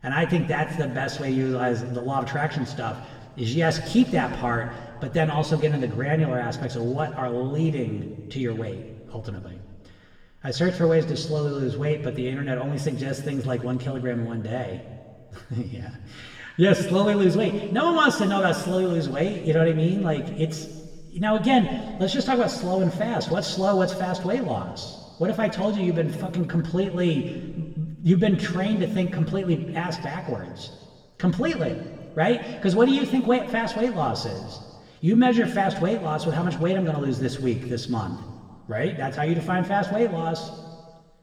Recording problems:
room echo; slight; dies away in 1.6 s
off-mic speech; somewhat distant

